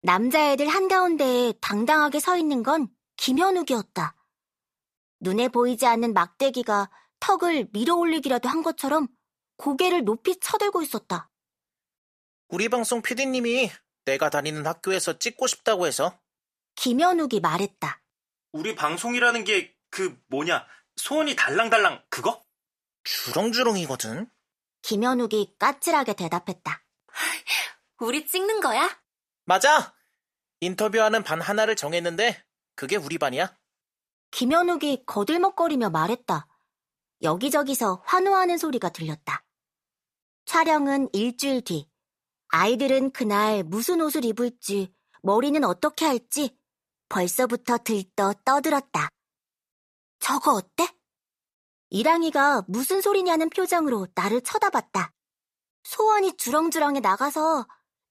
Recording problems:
none

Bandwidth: 14.5 kHz